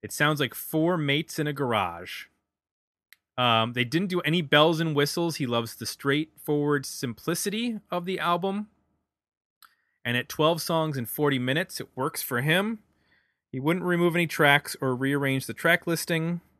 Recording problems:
none

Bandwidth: 13.5 kHz